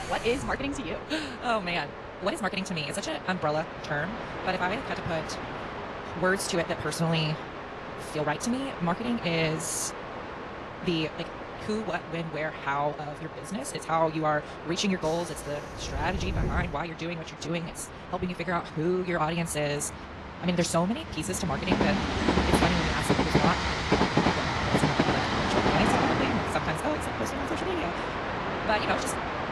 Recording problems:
wrong speed, natural pitch; too fast; 1.8 times normal speed
garbled, watery; slightly; nothing above 11.5 kHz
train or aircraft noise; loud; throughout; 1 dB below the speech

